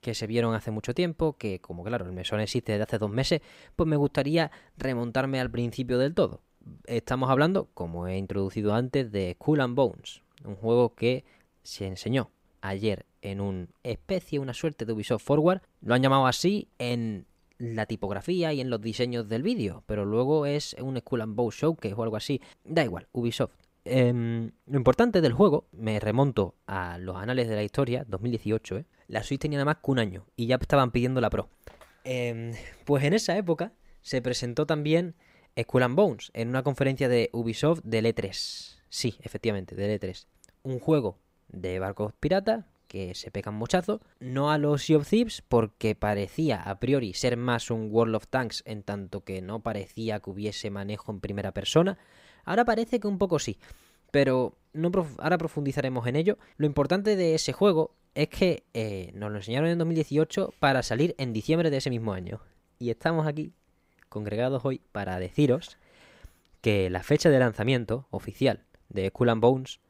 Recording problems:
none

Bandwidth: 15.5 kHz